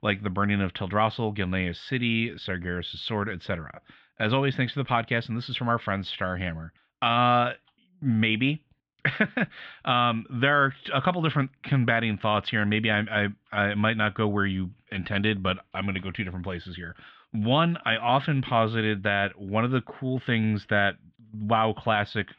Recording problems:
muffled; very; fading above 3 kHz

